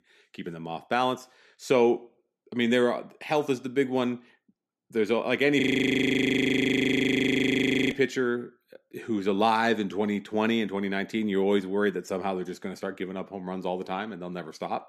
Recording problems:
audio freezing; at 5.5 s for 2.5 s

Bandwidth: 14 kHz